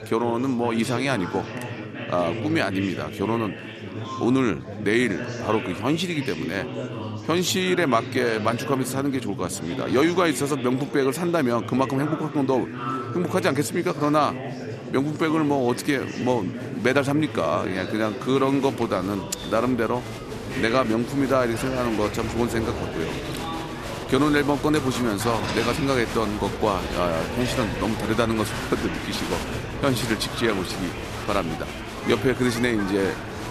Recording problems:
murmuring crowd; loud; throughout; 7 dB below the speech

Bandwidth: 14 kHz